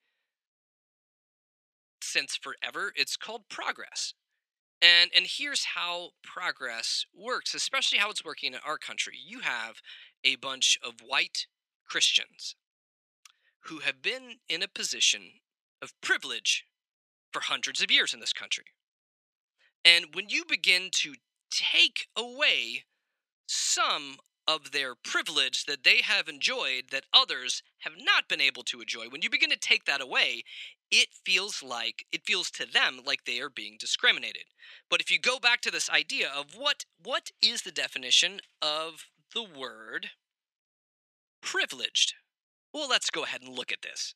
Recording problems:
thin; very; fading below 700 Hz

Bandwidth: 14 kHz